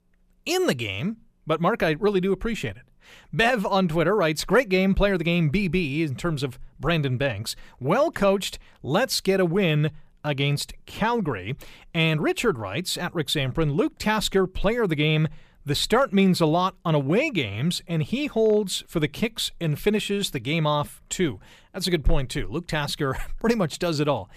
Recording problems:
none

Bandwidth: 14.5 kHz